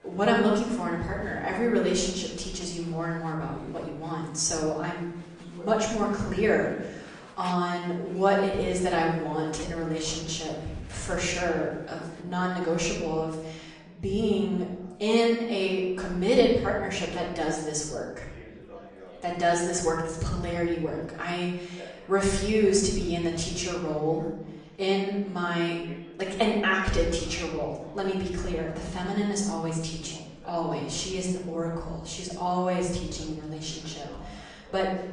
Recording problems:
off-mic speech; far
room echo; noticeable; dies away in 0.8 s
garbled, watery; slightly; nothing above 9 kHz
murmuring crowd; faint; throughout; 20 dB below the speech

